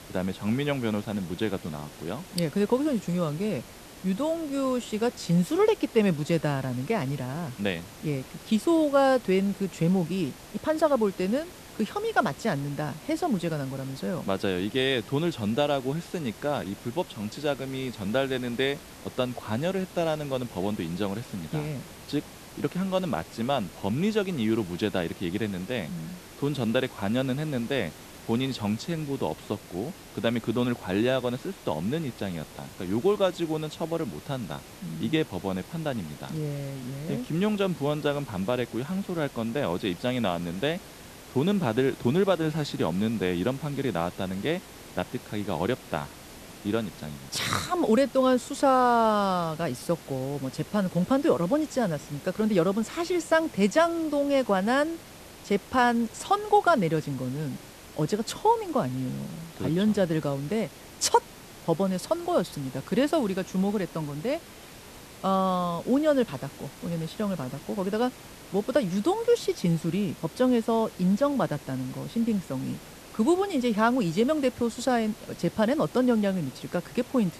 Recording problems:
hiss; noticeable; throughout; 15 dB below the speech

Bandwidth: 14 kHz